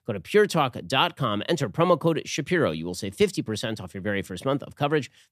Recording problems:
none

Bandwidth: 14.5 kHz